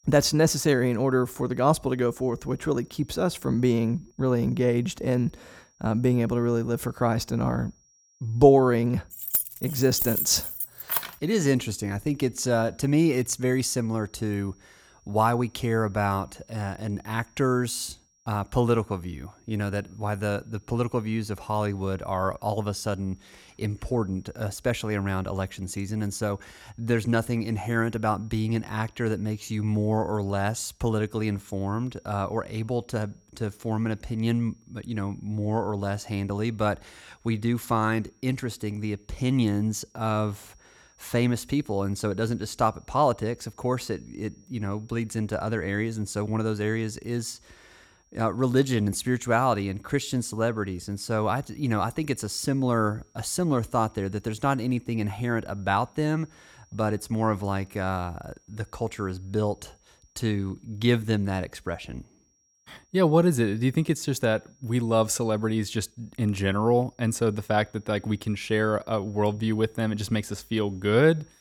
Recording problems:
high-pitched whine; faint; throughout; 5.5 kHz, 35 dB below the speech
jangling keys; loud; from 9 to 11 s; peak 2 dB above the speech

